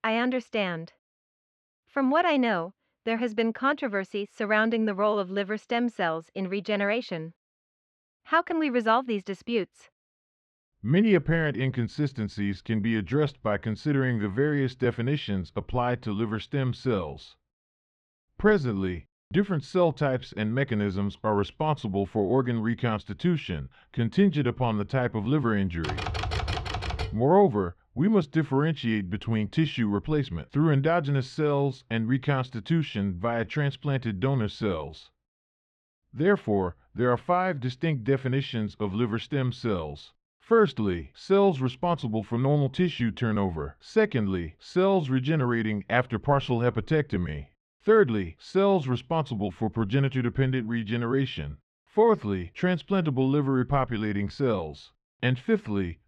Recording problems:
muffled; slightly; fading above 3 kHz
keyboard typing; noticeable; from 26 to 27 s; peak 3 dB below the speech

